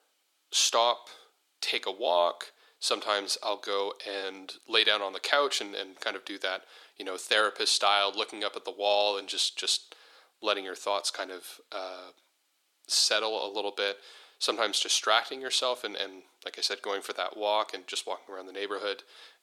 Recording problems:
thin; very; fading below 300 Hz

